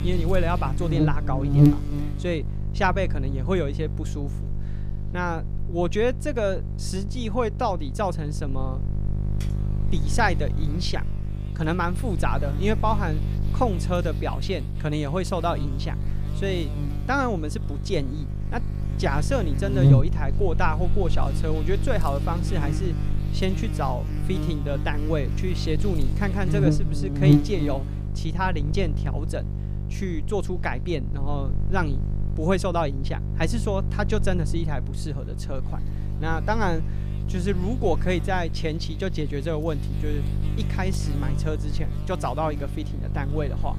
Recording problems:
electrical hum; loud; throughout; 50 Hz, 8 dB below the speech
keyboard typing; faint; at 9.5 s; peak 15 dB below the speech

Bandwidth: 14.5 kHz